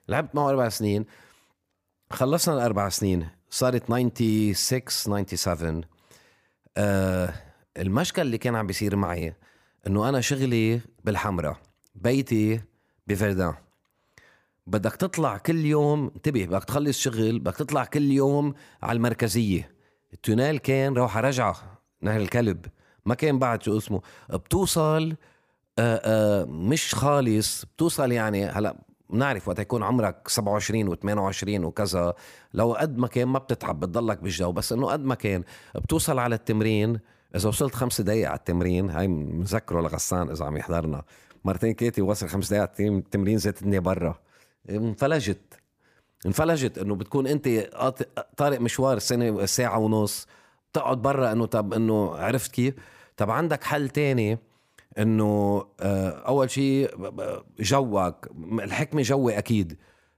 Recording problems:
none

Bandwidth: 15 kHz